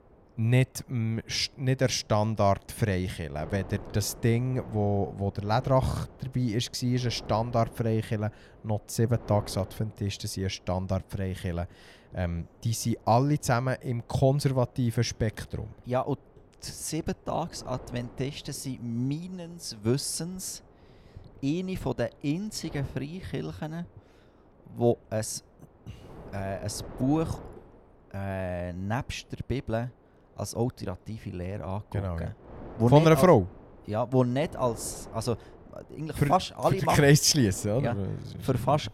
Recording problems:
wind noise on the microphone; occasional gusts; 20 dB below the speech

